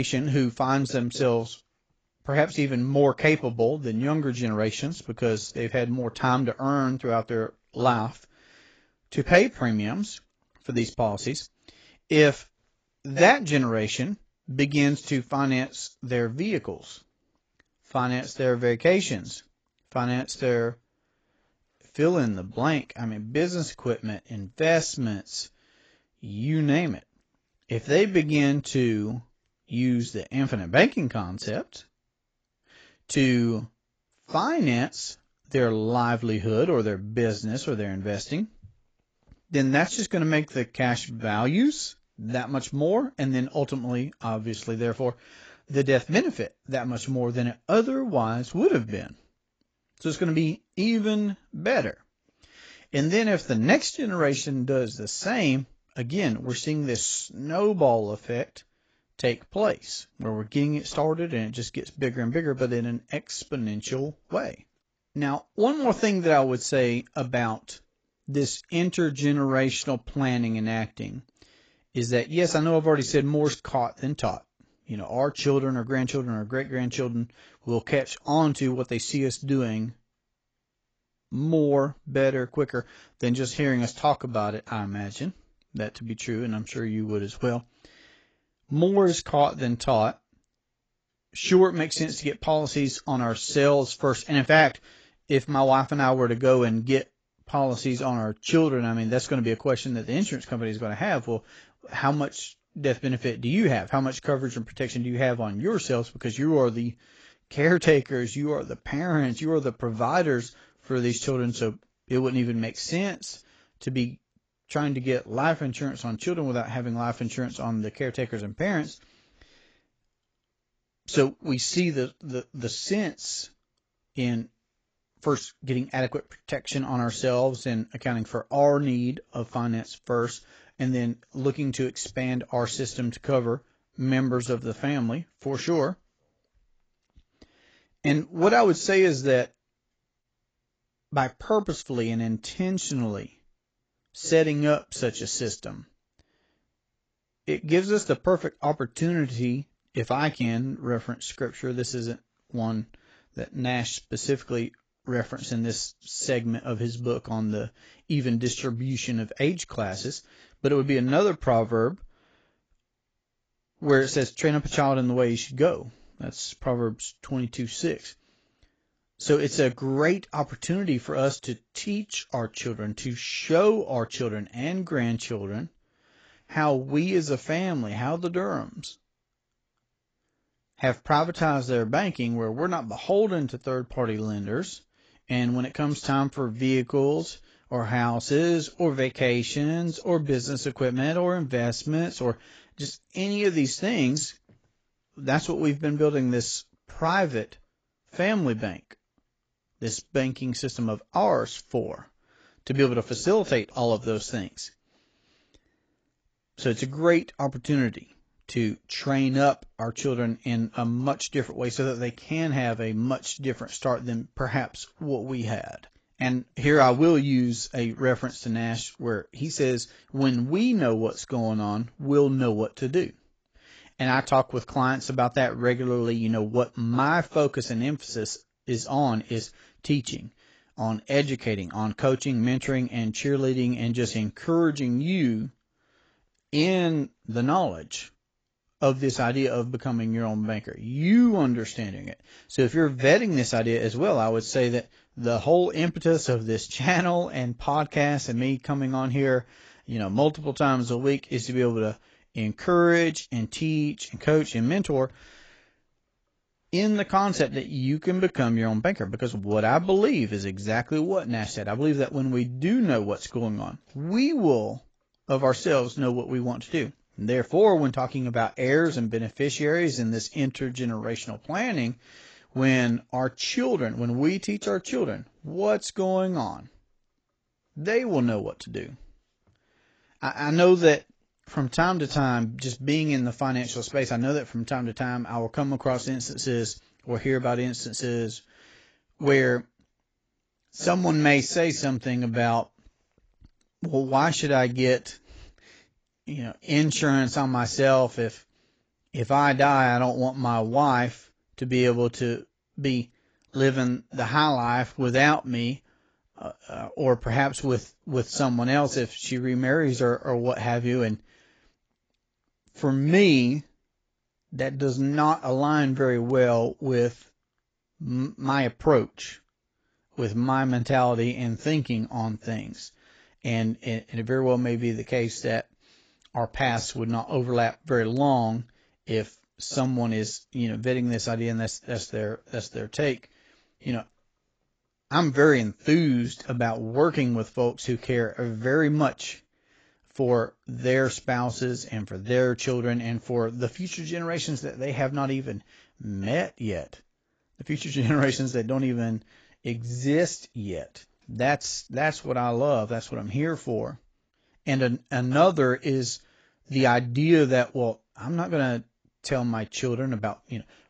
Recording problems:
garbled, watery; badly; nothing above 7.5 kHz
abrupt cut into speech; at the start

